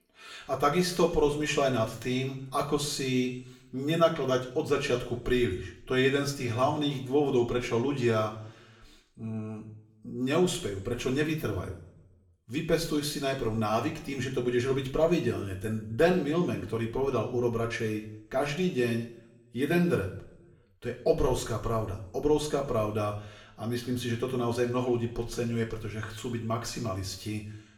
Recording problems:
room echo; slight; dies away in 0.7 s
off-mic speech; somewhat distant

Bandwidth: 17.5 kHz